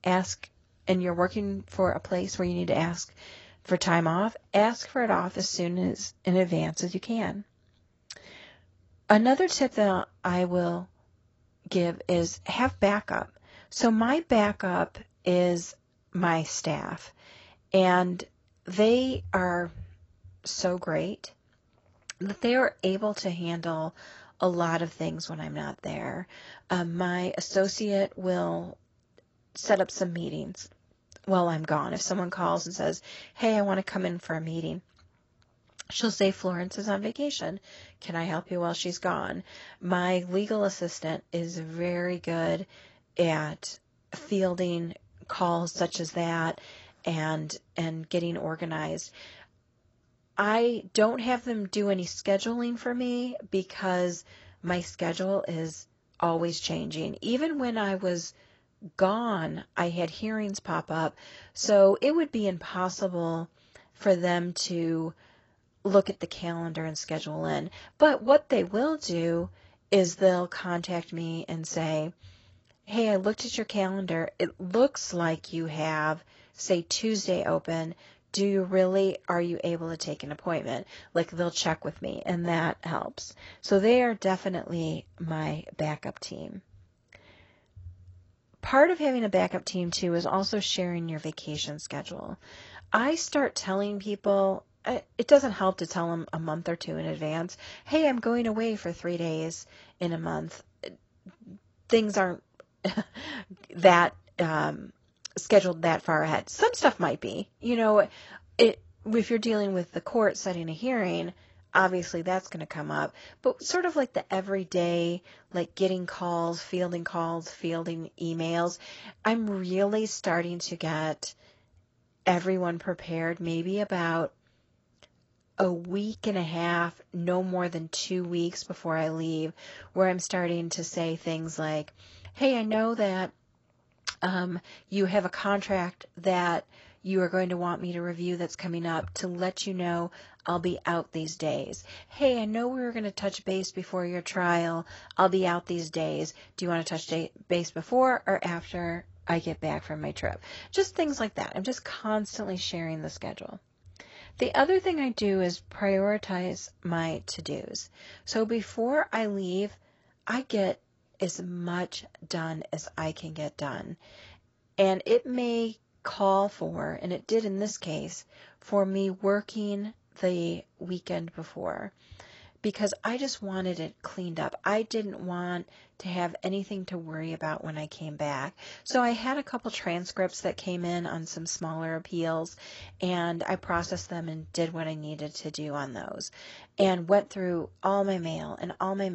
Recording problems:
garbled, watery; badly; nothing above 8 kHz
abrupt cut into speech; at the end

